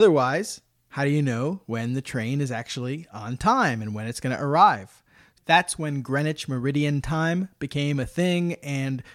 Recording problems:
abrupt cut into speech; at the start

